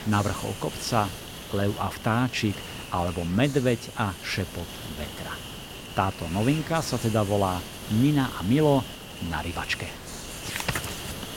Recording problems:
hiss; noticeable; throughout; 10 dB below the speech

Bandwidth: 16.5 kHz